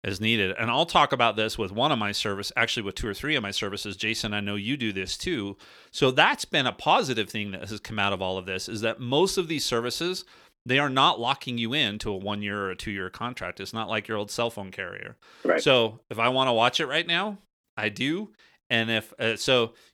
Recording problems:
none

